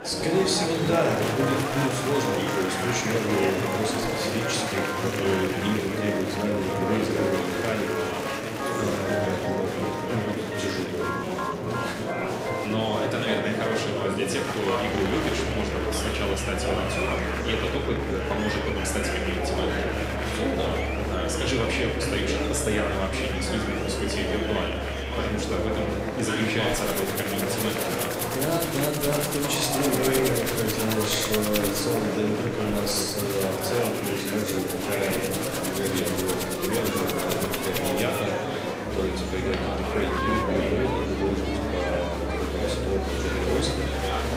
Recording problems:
room echo; noticeable; dies away in 0.9 s
off-mic speech; somewhat distant
background music; loud; throughout; 5 dB below the speech
murmuring crowd; loud; throughout; as loud as the speech

